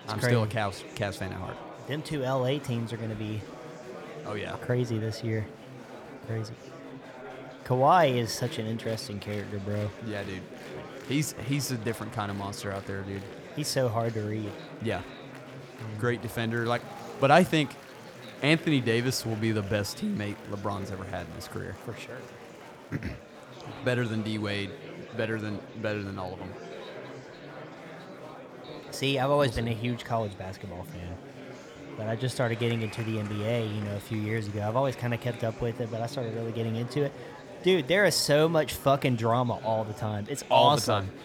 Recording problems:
murmuring crowd; noticeable; throughout; 15 dB below the speech

